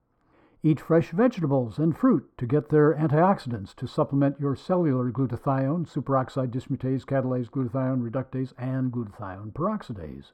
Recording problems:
muffled; very; fading above 2 kHz

